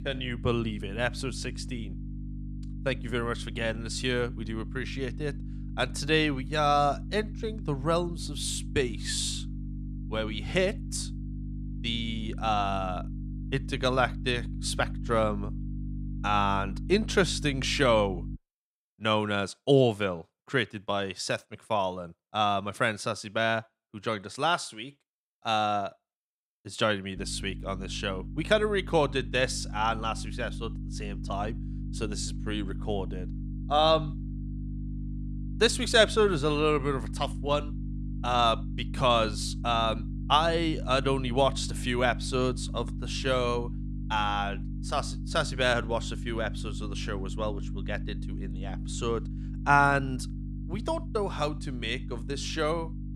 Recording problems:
electrical hum; noticeable; until 18 s and from 27 s on; 50 Hz, 20 dB below the speech

